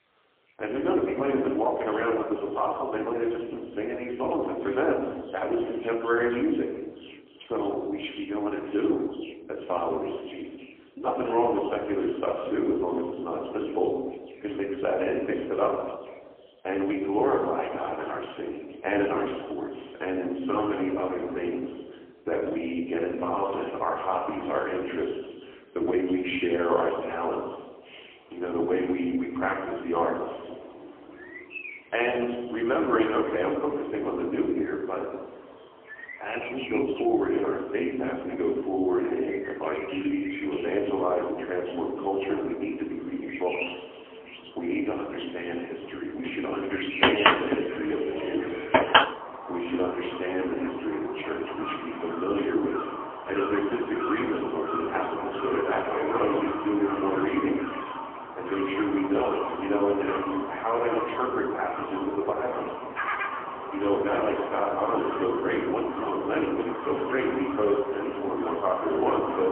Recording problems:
phone-call audio; poor line; nothing above 3 kHz
room echo; noticeable; dies away in 1 s
off-mic speech; somewhat distant
animal sounds; loud; throughout; 4 dB below the speech

